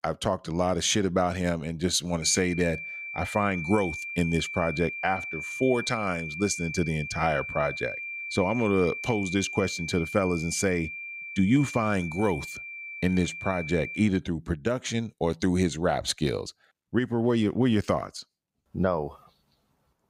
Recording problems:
high-pitched whine; loud; from 2 to 14 s; 2.5 kHz, 7 dB below the speech

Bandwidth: 15.5 kHz